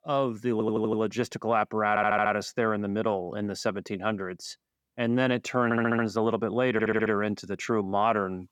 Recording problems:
audio stuttering; 4 times, first at 0.5 s

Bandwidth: 18 kHz